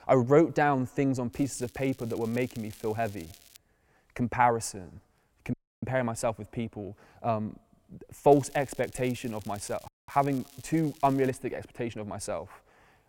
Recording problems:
crackling; faint; from 1.5 to 3.5 s and from 8.5 to 11 s; 20 dB below the speech
audio cutting out; at 5.5 s and at 10 s

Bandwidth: 16.5 kHz